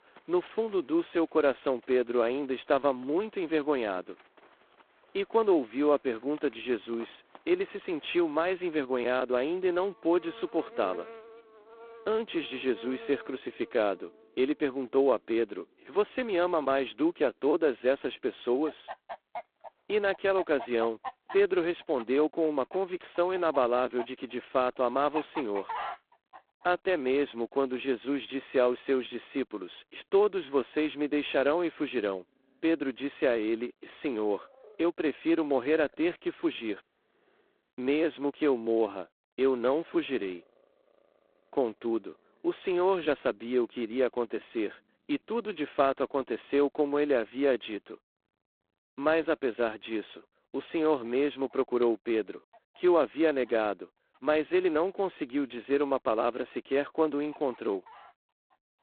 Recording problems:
phone-call audio; poor line; nothing above 4 kHz
animal sounds; noticeable; throughout; 20 dB below the speech

